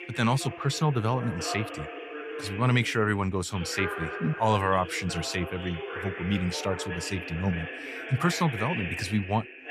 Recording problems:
voice in the background; loud; throughout; 8 dB below the speech

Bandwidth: 15.5 kHz